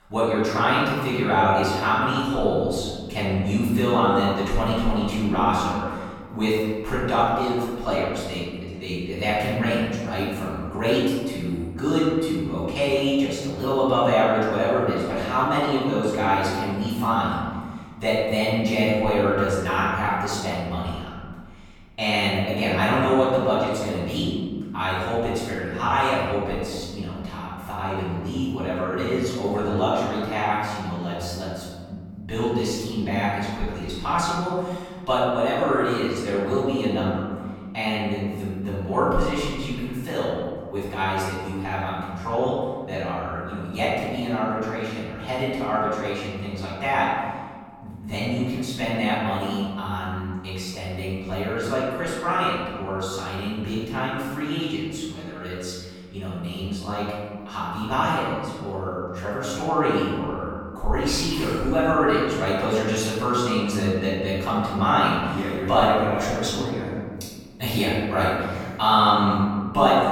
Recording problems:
room echo; strong; dies away in 1.7 s
off-mic speech; far

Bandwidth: 17 kHz